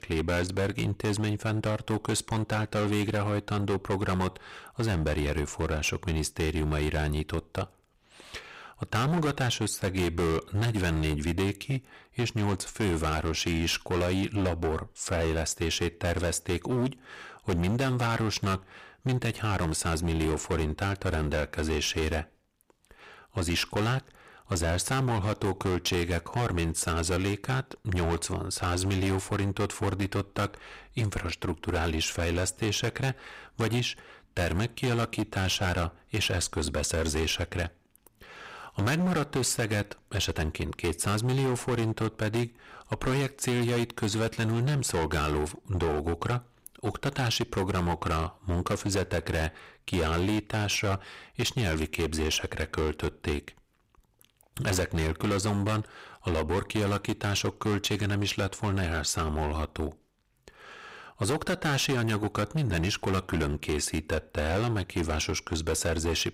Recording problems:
distortion; heavy; 16% of the sound clipped

